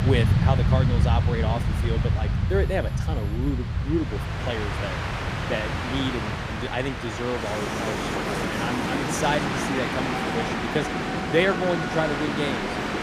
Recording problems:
train or aircraft noise; very loud; throughout; 3 dB above the speech
alarms or sirens; faint; until 4 s; 25 dB below the speech

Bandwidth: 15 kHz